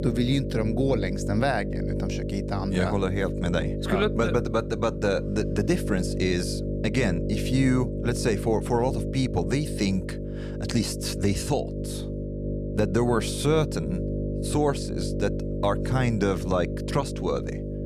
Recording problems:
electrical hum; loud; throughout; 50 Hz, 7 dB below the speech

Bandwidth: 14.5 kHz